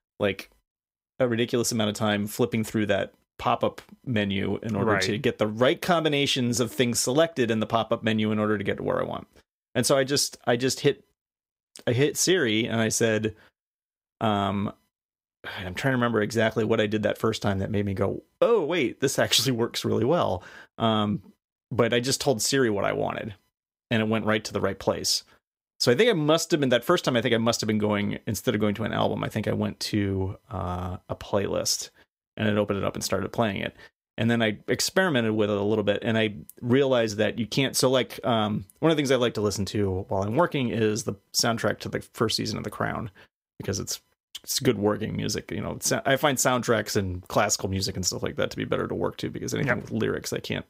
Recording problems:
none

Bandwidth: 15.5 kHz